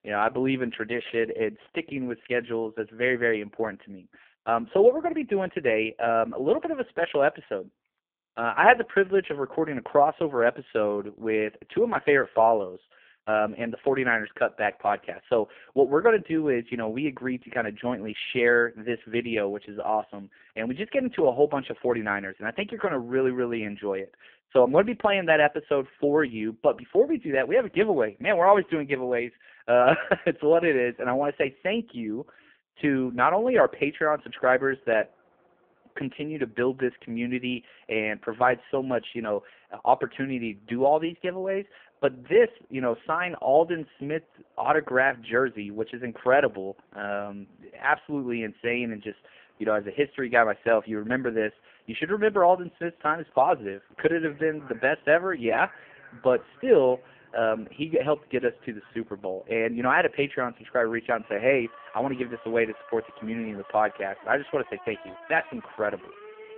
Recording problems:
phone-call audio; poor line
traffic noise; faint; from 33 s on; 25 dB below the speech

